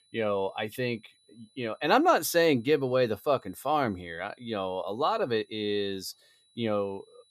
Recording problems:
high-pitched whine; faint; throughout; 4 kHz, 35 dB below the speech

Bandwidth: 14.5 kHz